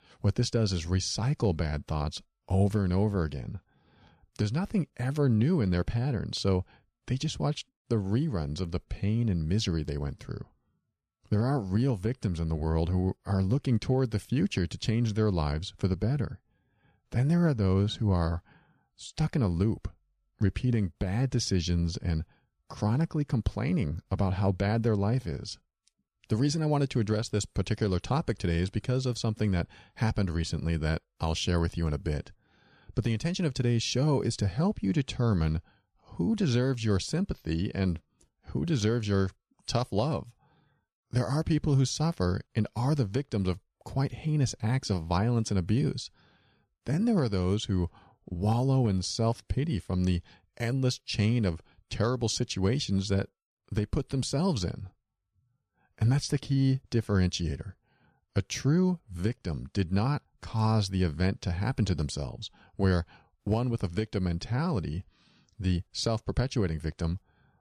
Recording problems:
none

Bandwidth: 14.5 kHz